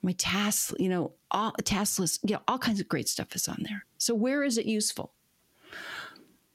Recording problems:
squashed, flat; heavily

